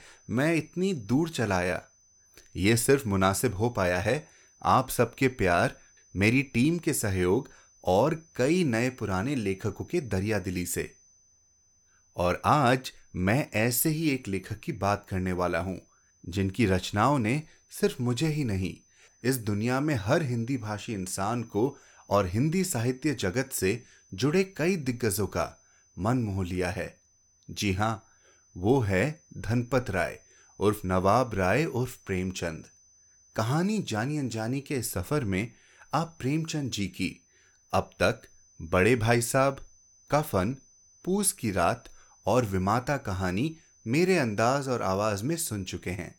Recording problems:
high-pitched whine; faint; throughout; 6 kHz, 30 dB below the speech

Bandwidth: 17 kHz